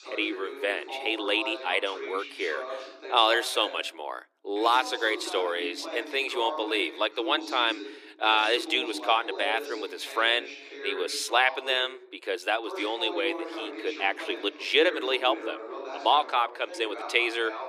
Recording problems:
thin; very; fading below 300 Hz
voice in the background; noticeable; throughout; 10 dB below the speech

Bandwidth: 15 kHz